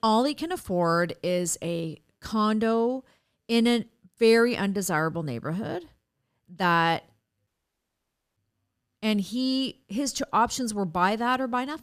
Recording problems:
audio cutting out; at 7.5 s for 1 s

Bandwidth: 14.5 kHz